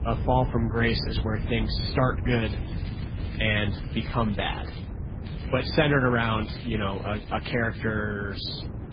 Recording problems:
garbled, watery; badly; nothing above 5 kHz
low rumble; noticeable; throughout; 15 dB below the speech
crackling; faint; from 2.5 to 5 s and from 5.5 to 8 s; 20 dB below the speech

